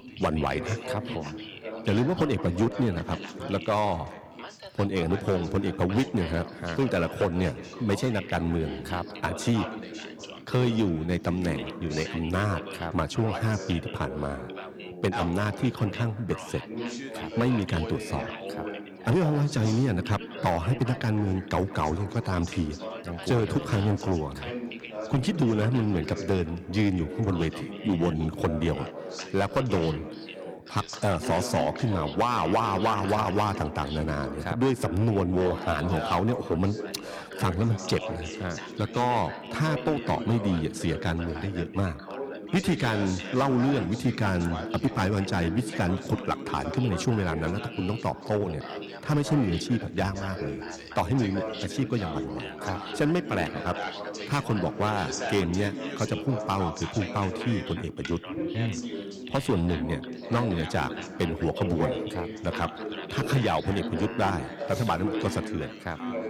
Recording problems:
echo of what is said; noticeable; throughout; 170 ms later, 15 dB below the speech
distortion; slight; 4% of the sound clipped
background chatter; loud; throughout; 3 voices, 9 dB below the speech

